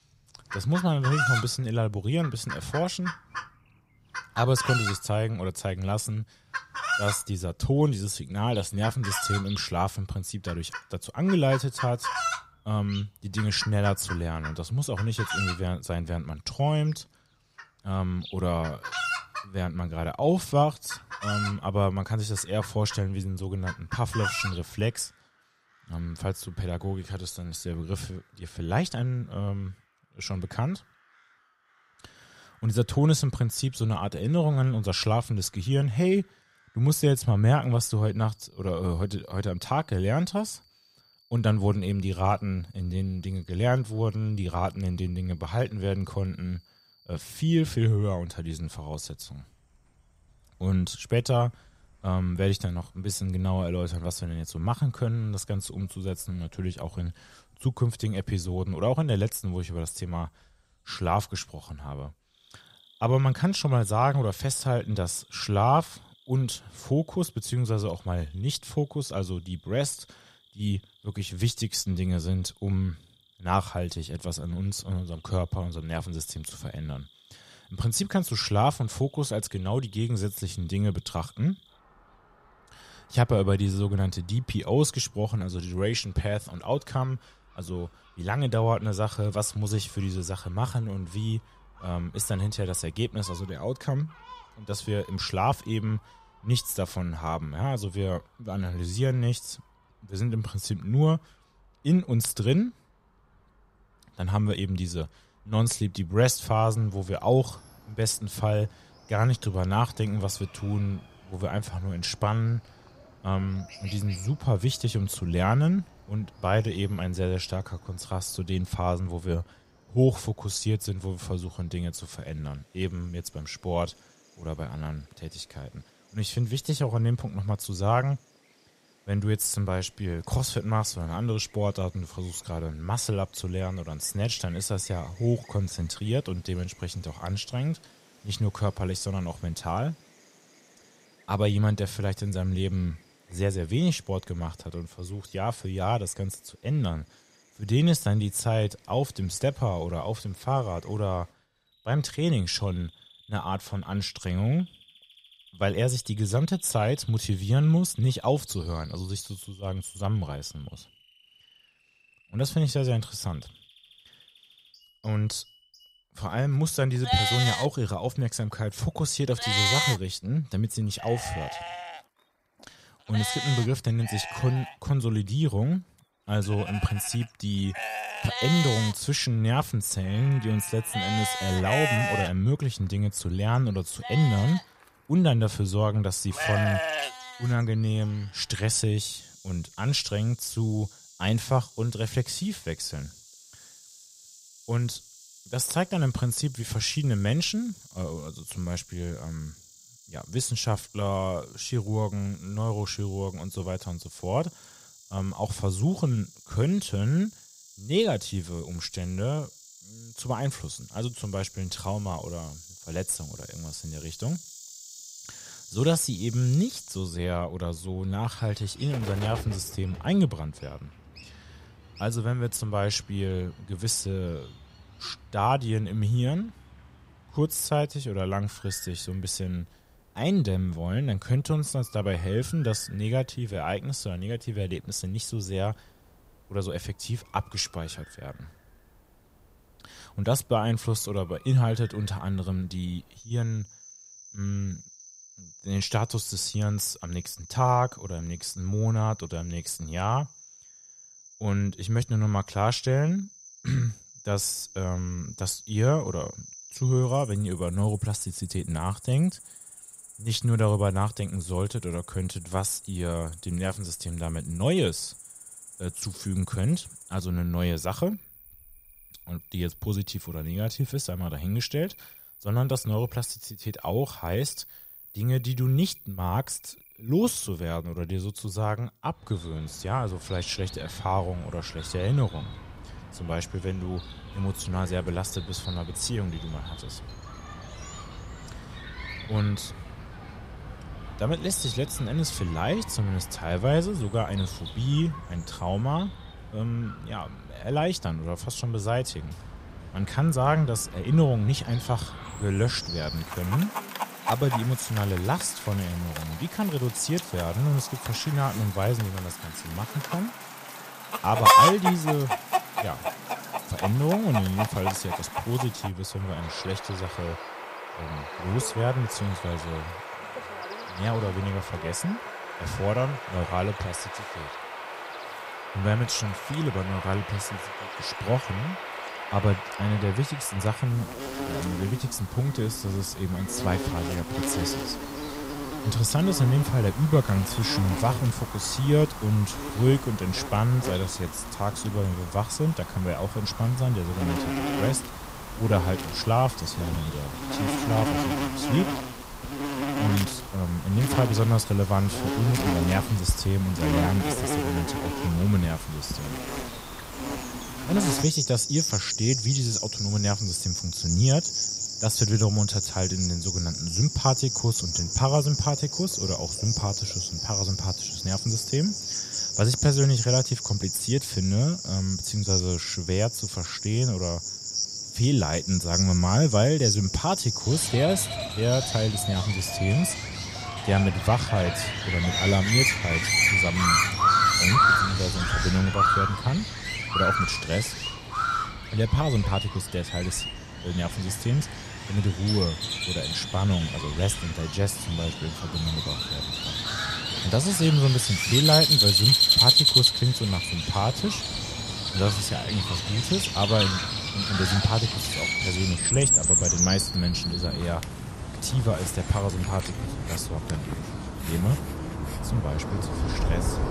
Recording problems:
animal sounds; loud; throughout; 1 dB below the speech

